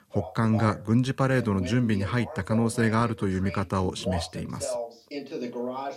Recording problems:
voice in the background; noticeable; throughout; 10 dB below the speech

